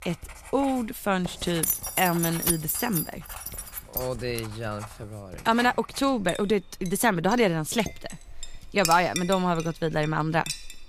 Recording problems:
household noises; noticeable; throughout; 15 dB below the speech
jangling keys; loud; from 1.5 to 4 s; peak 1 dB above the speech
clattering dishes; faint; at 8 s; peak 15 dB below the speech

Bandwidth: 14.5 kHz